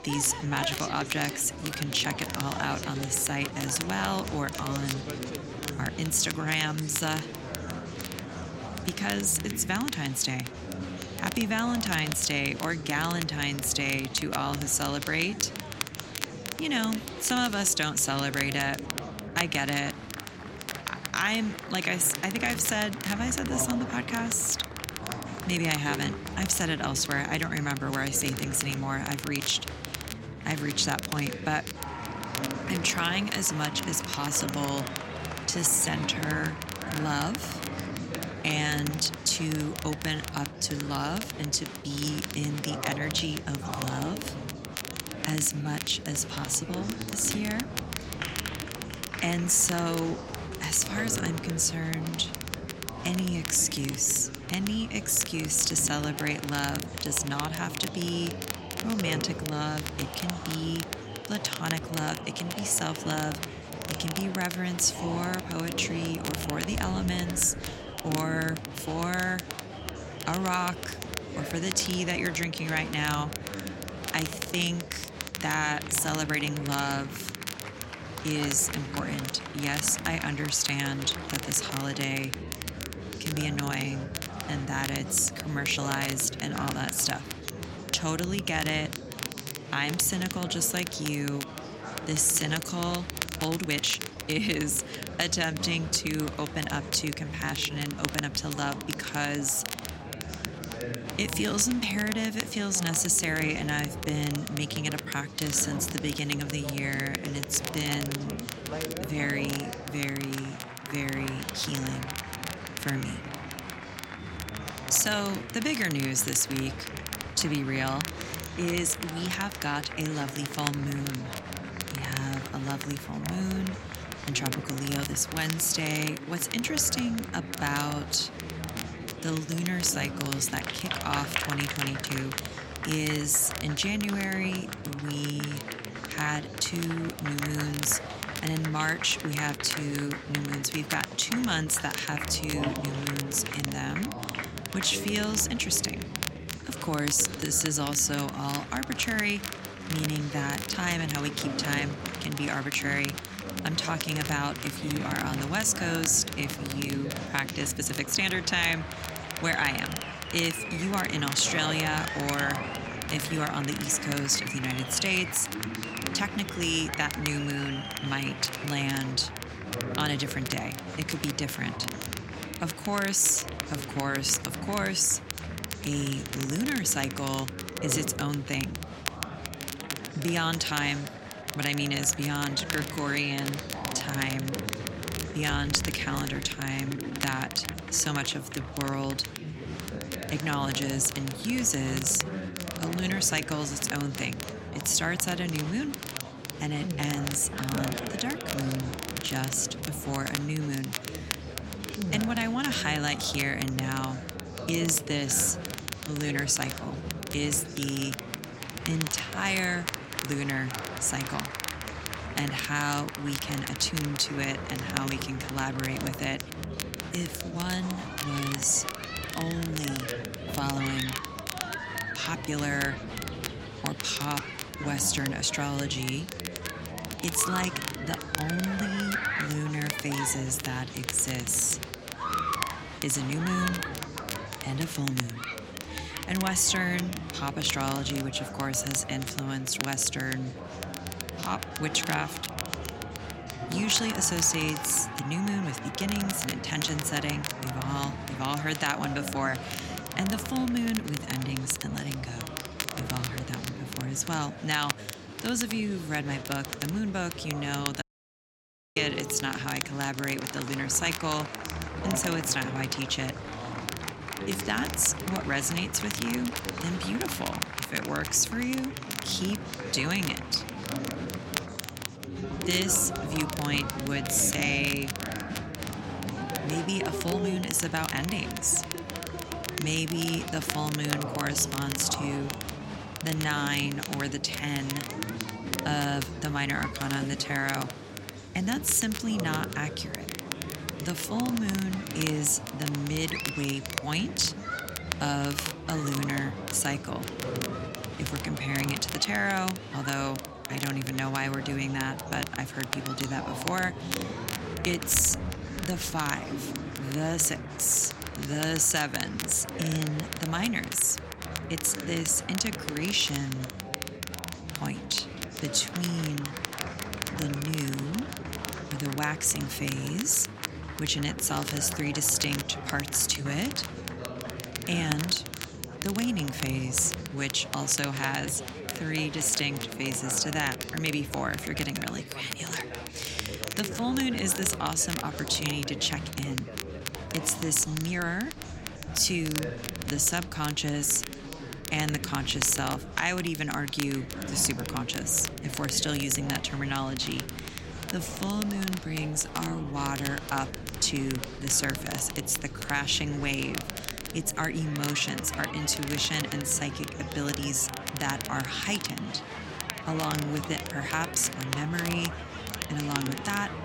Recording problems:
chatter from many people; loud; throughout; 9 dB below the speech
crackle, like an old record; loud; 9 dB below the speech
uneven, jittery; strongly; from 35 s to 3:29
audio cutting out; at 4:18 for 1 s

